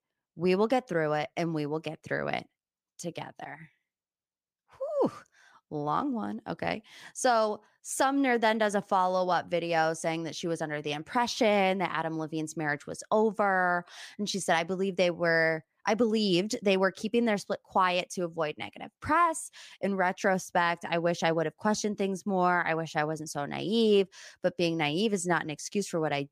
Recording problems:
none

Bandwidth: 15 kHz